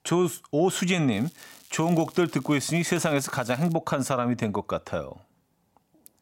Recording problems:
crackling; faint; from 1 to 3.5 s; 25 dB below the speech

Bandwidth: 16 kHz